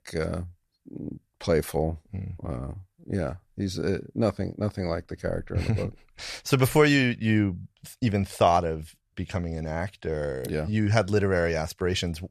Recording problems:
none

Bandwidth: 14.5 kHz